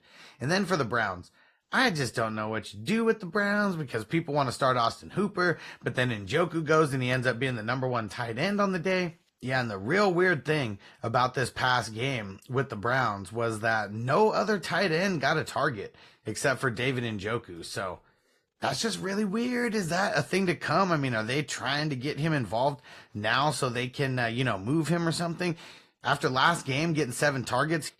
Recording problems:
garbled, watery; slightly

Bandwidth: 14 kHz